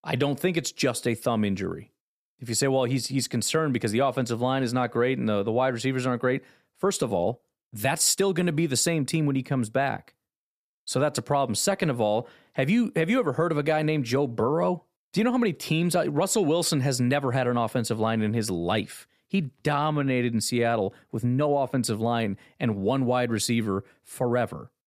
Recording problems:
uneven, jittery; slightly; from 7 to 22 s

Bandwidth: 14.5 kHz